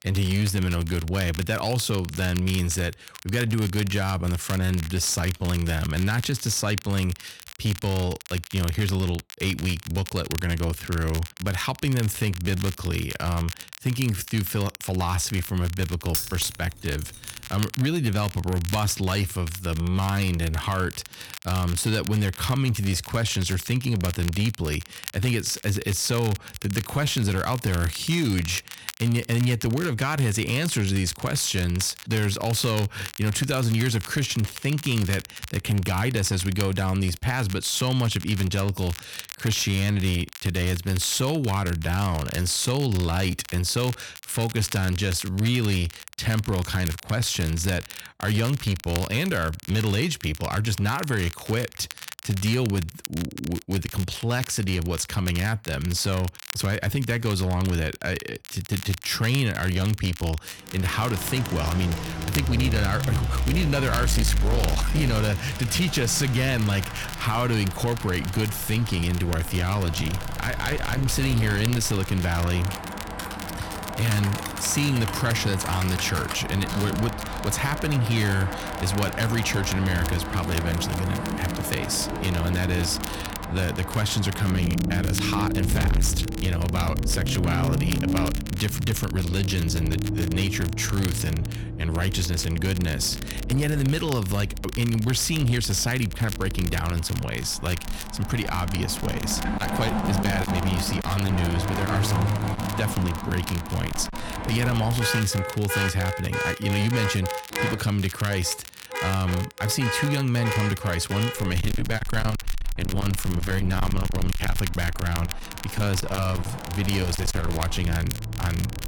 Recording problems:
distortion; slight; 11% of the sound clipped
traffic noise; loud; from 1:01 on; 5 dB below the speech
crackle, like an old record; noticeable; 15 dB below the speech
jangling keys; noticeable; from 16 to 17 s; peak 1 dB below the speech
keyboard typing; noticeable; from 1:13 to 1:16; peak 7 dB below the speech

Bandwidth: 18 kHz